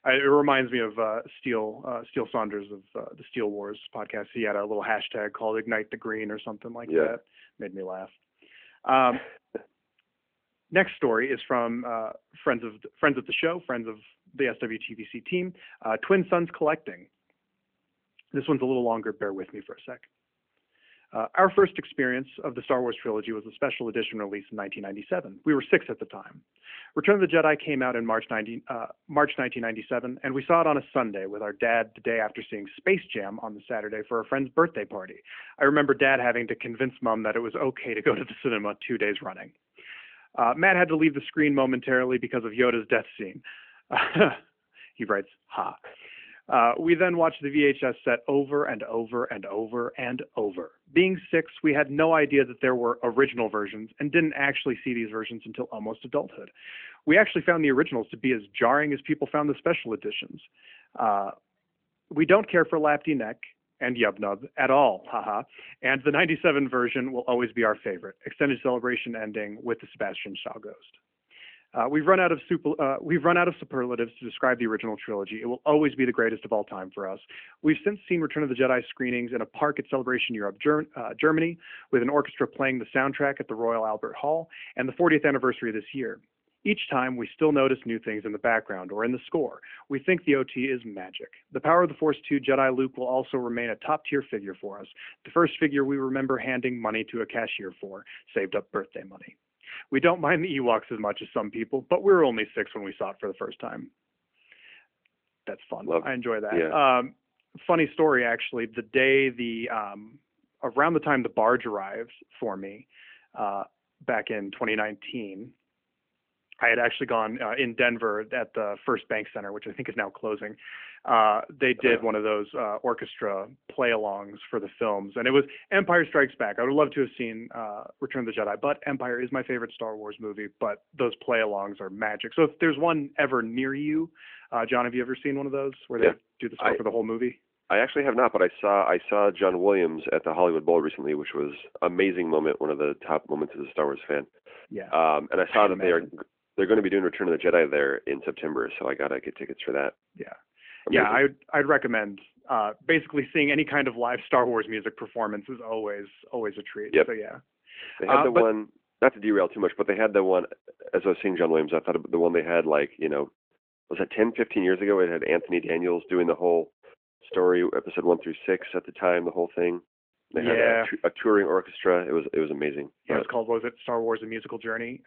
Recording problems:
phone-call audio; nothing above 3 kHz

